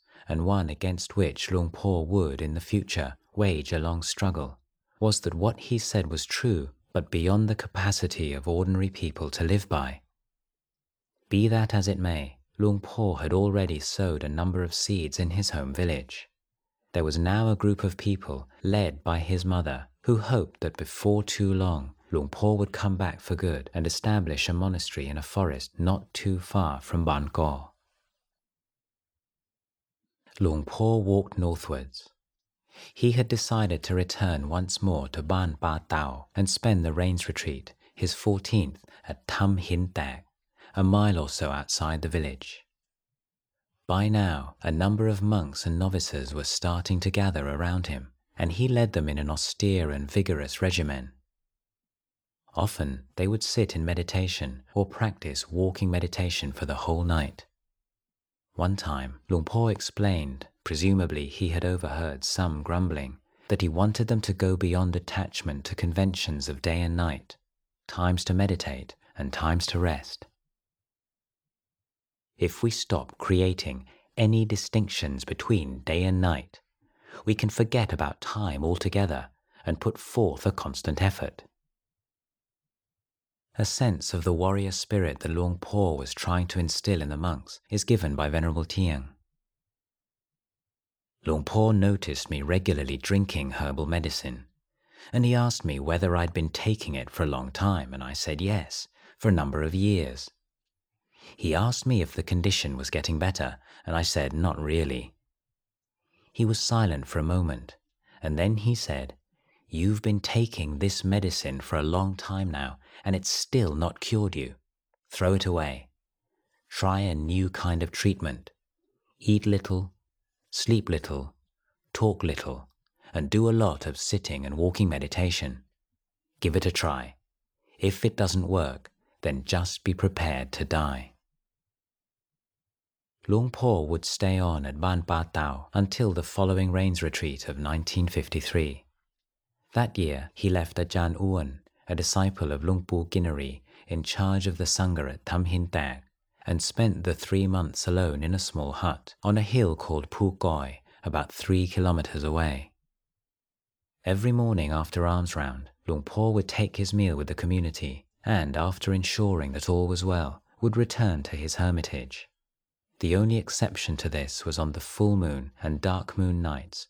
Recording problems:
none

